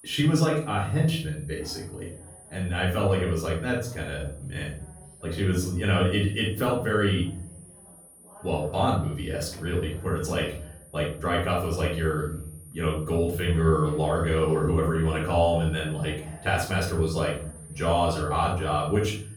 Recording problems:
off-mic speech; far
room echo; noticeable; dies away in 0.5 s
high-pitched whine; faint; throughout; 9.5 kHz, 20 dB below the speech
voice in the background; faint; throughout; 25 dB below the speech

